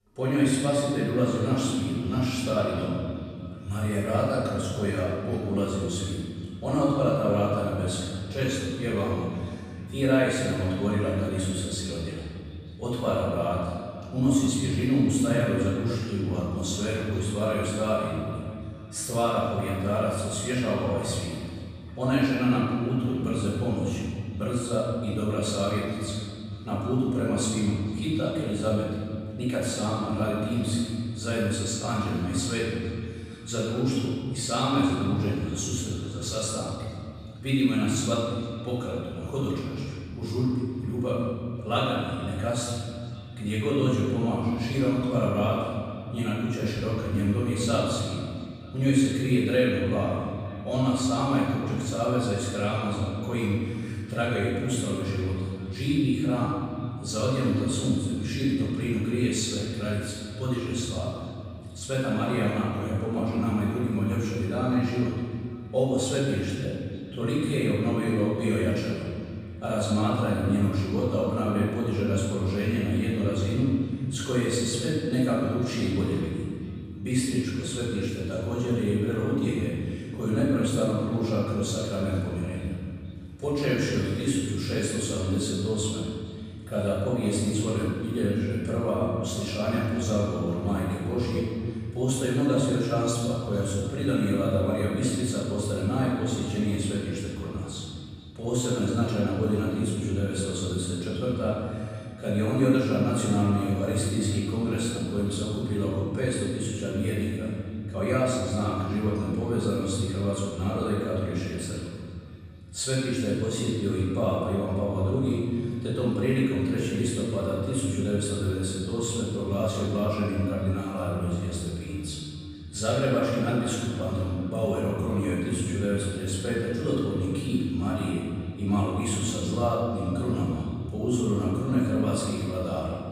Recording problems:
room echo; strong; dies away in 2.4 s
off-mic speech; far
echo of what is said; faint; throughout; 460 ms later, 25 dB below the speech

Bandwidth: 14 kHz